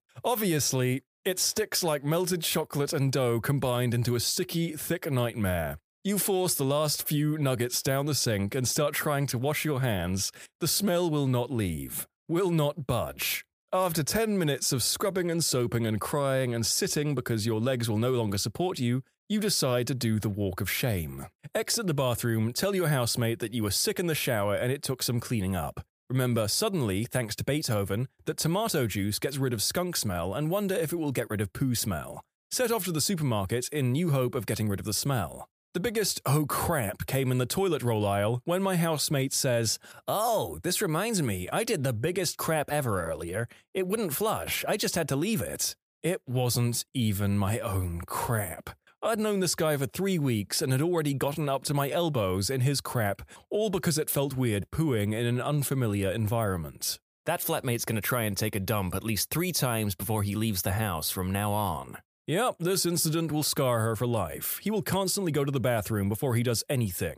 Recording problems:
none

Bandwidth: 15 kHz